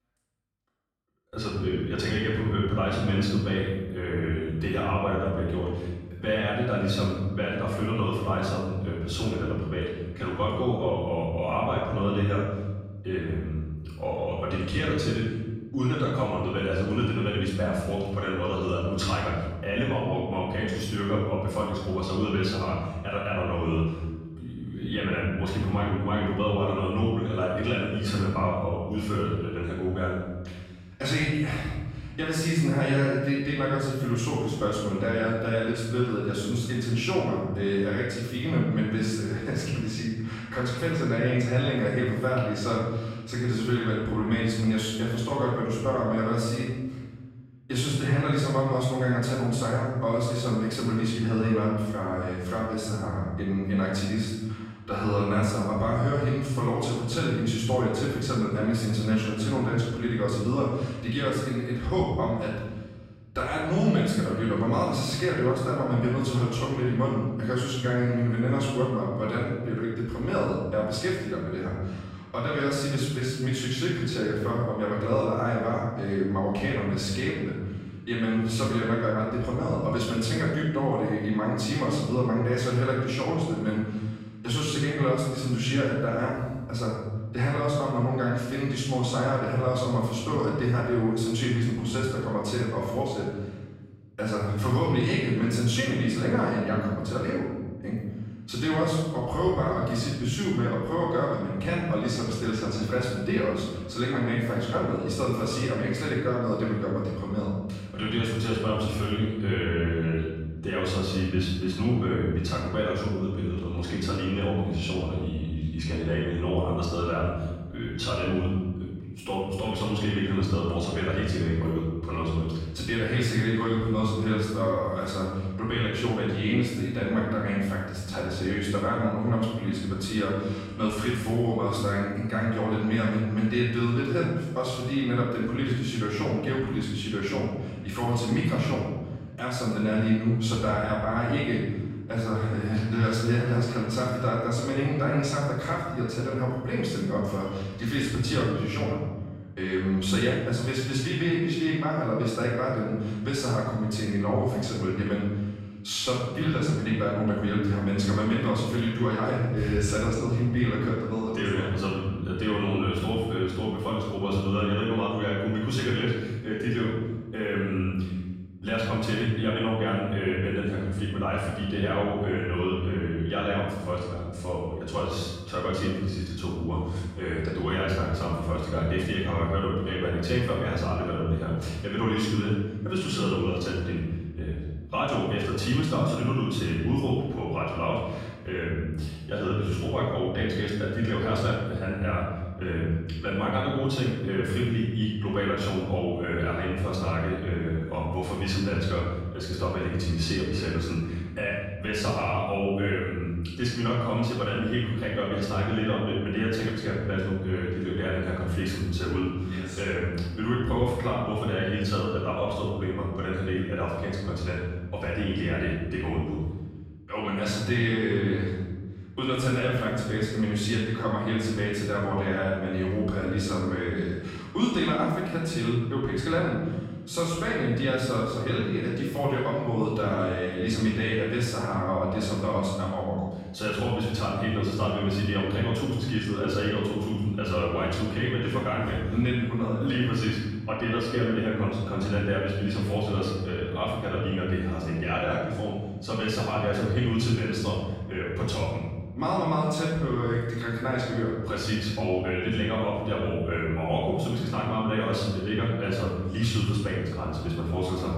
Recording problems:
room echo; strong; dies away in 1.4 s
off-mic speech; far

